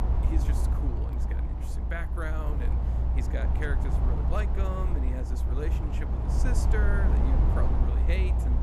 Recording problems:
low rumble; loud; throughout; 1 dB below the speech

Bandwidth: 15 kHz